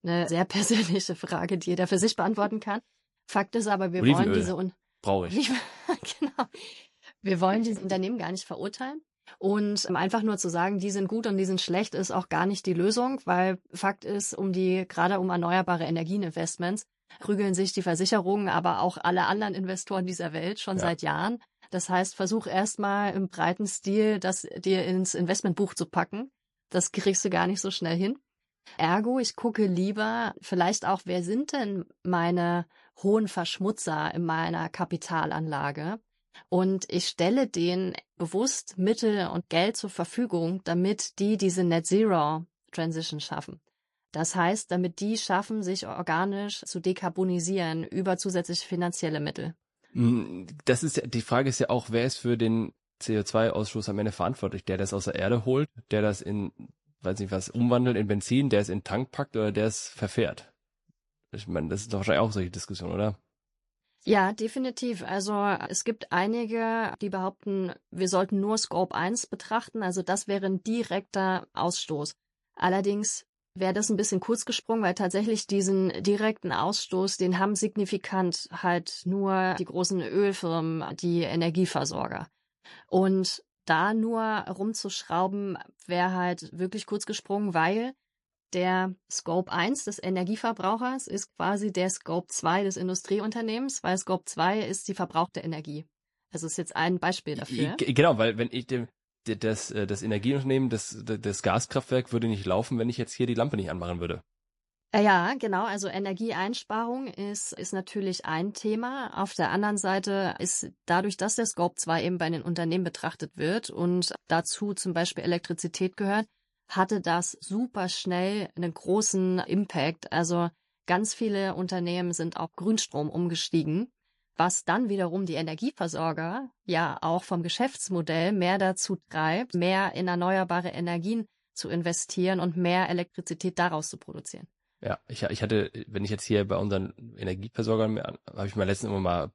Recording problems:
garbled, watery; slightly; nothing above 11 kHz

